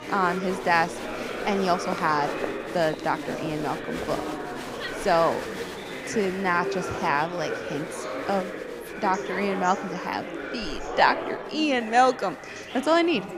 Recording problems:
chatter from many people; loud; throughout; 7 dB below the speech

